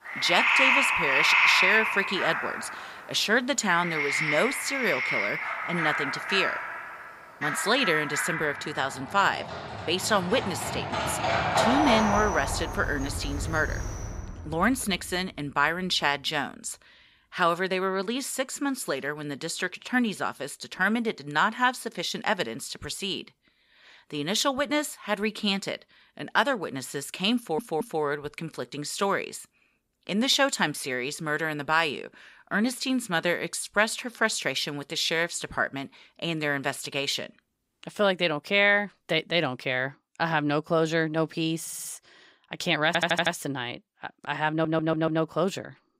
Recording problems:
animal sounds; very loud; until 14 s; 1 dB above the speech
audio stuttering; 4 times, first at 27 s

